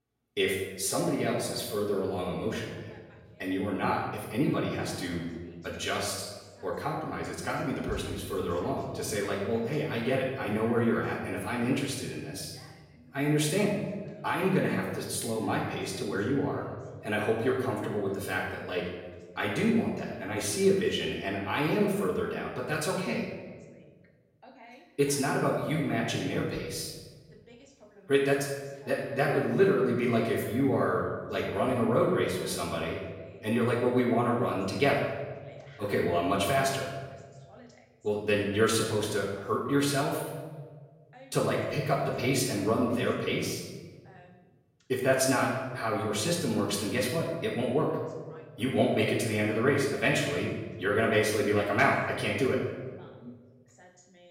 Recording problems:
off-mic speech; far
room echo; noticeable; dies away in 1.1 s
voice in the background; faint; throughout; 25 dB below the speech

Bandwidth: 16.5 kHz